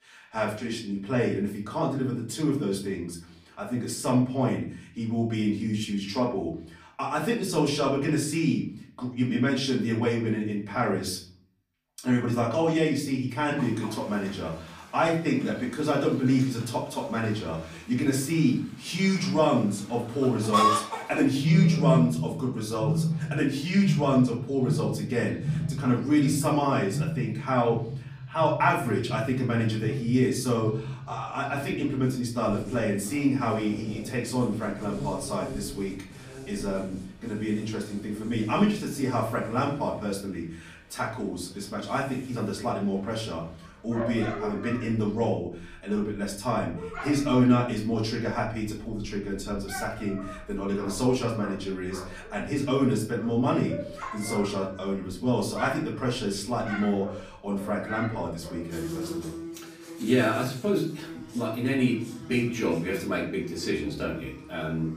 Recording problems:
off-mic speech; far
room echo; slight; dies away in 0.5 s
animal sounds; loud; from 14 s on; 6 dB below the speech

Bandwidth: 15 kHz